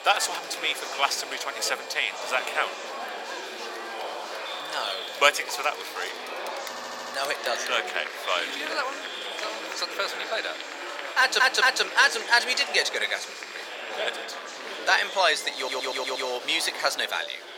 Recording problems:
thin; very; fading below 500 Hz
murmuring crowd; loud; throughout; 9 dB below the speech
high-pitched whine; faint; until 6 s and from 8.5 to 14 s; 2.5 kHz, 20 dB below the speech
audio stuttering; at 6.5 s, at 11 s and at 16 s

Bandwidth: 17 kHz